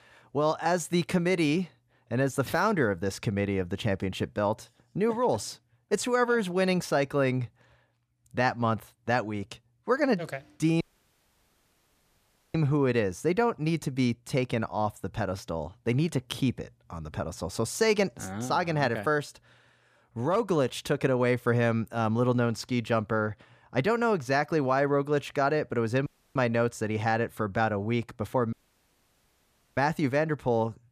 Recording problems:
audio cutting out; at 11 s for 1.5 s, at 26 s and at 29 s for 1 s

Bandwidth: 14.5 kHz